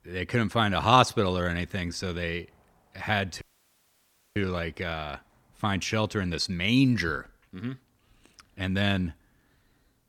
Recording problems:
audio cutting out; at 3.5 s for 1 s

